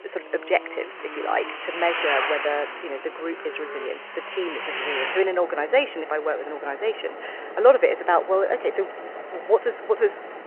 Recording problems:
phone-call audio
traffic noise; loud; throughout; 7 dB below the speech

